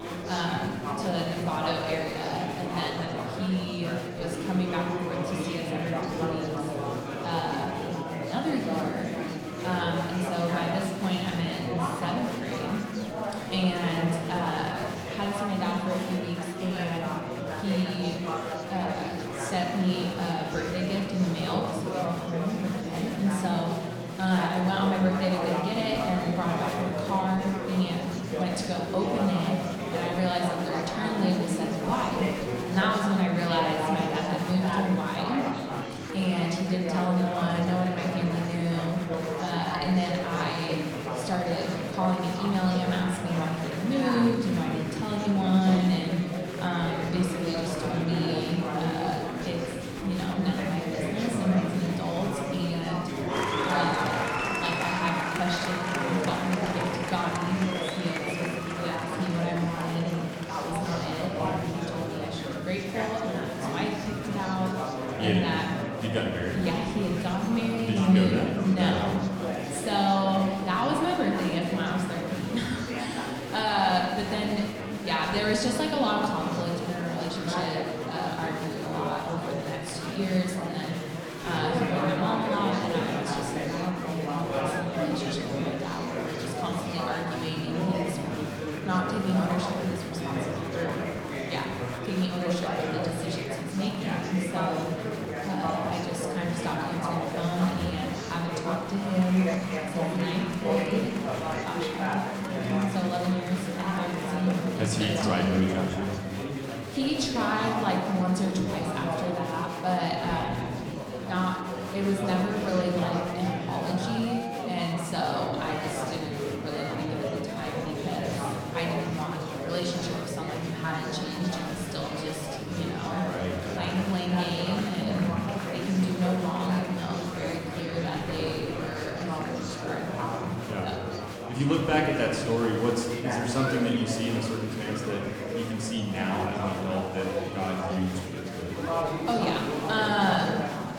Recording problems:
room echo; noticeable; dies away in 1.5 s
off-mic speech; somewhat distant
chatter from many people; loud; throughout; 3 dB below the speech

